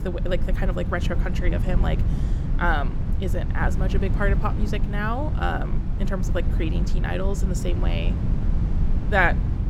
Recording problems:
low rumble; noticeable; throughout; 10 dB below the speech

